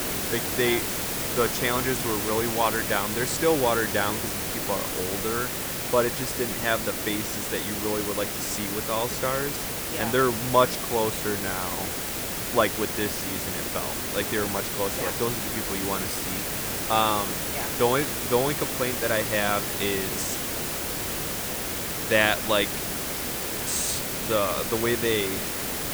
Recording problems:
hiss; loud; throughout; as loud as the speech

